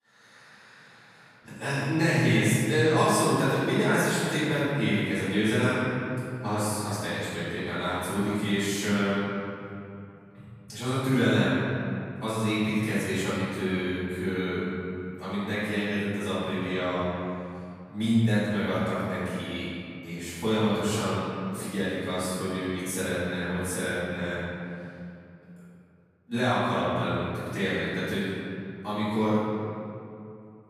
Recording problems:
room echo; strong; dies away in 2.4 s
off-mic speech; far

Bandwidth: 14.5 kHz